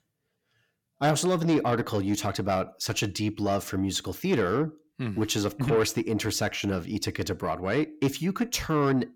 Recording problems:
distortion; slight; 10 dB below the speech

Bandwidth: 17 kHz